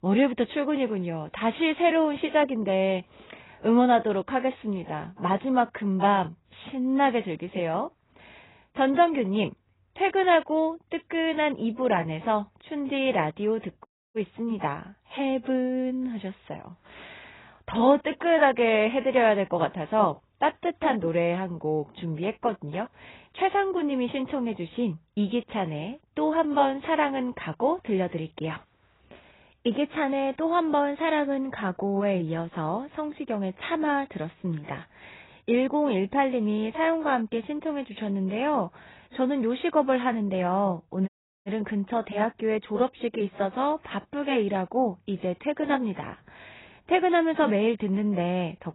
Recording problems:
garbled, watery; badly; nothing above 4 kHz
audio cutting out; at 14 s and at 41 s

